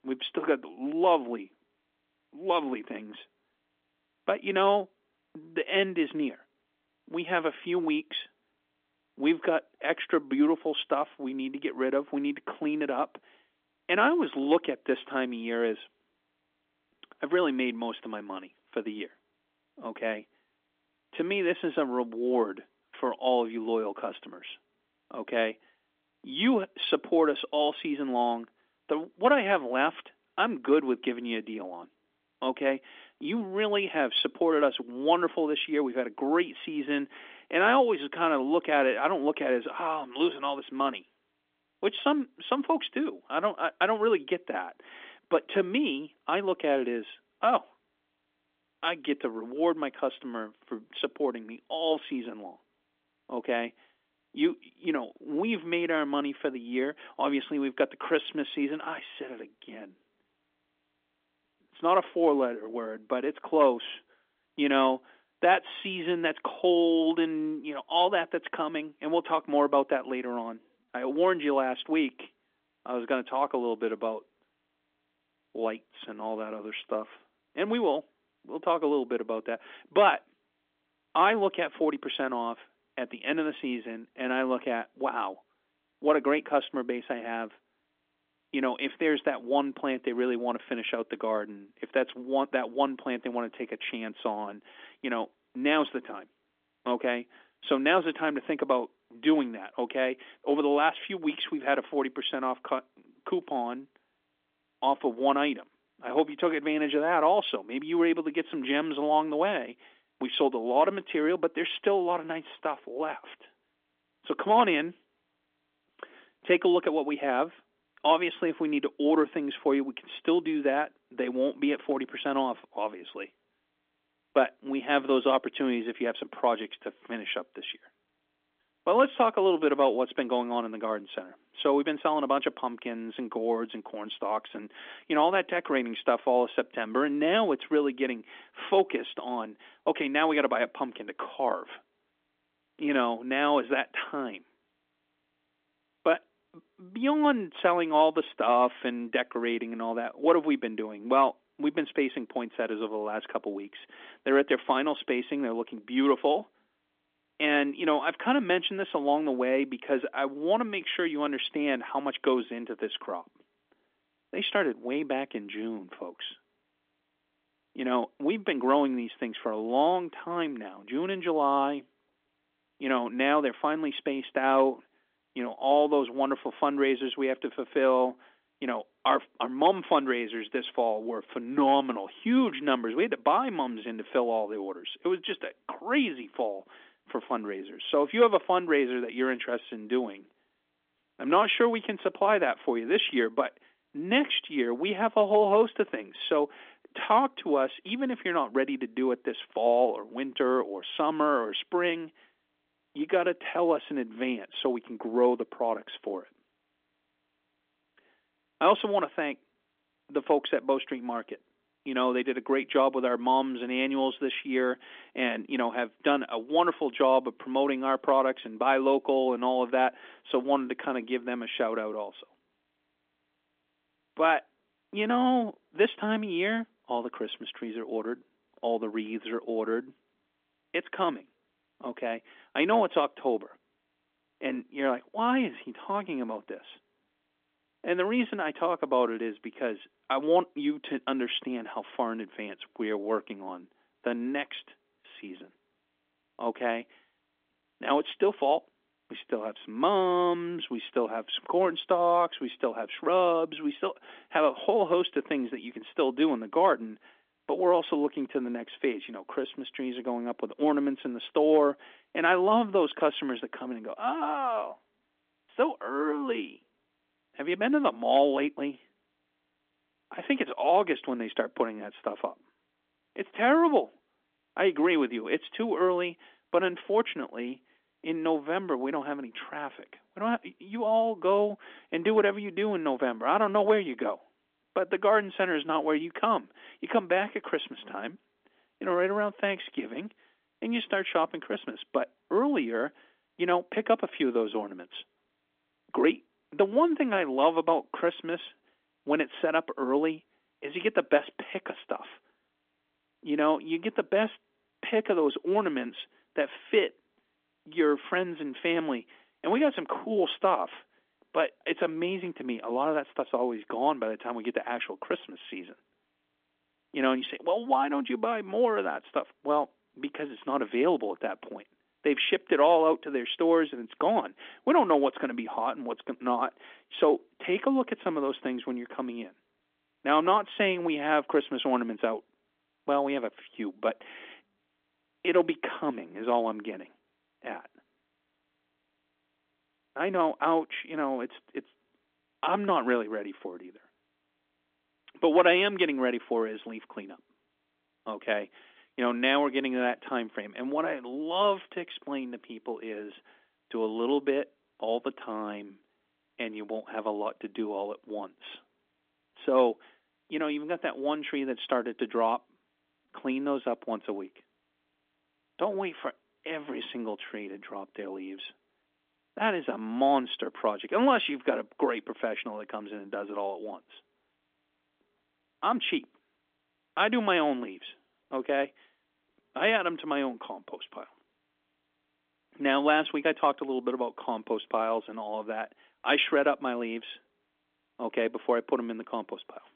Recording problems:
phone-call audio; nothing above 3.5 kHz

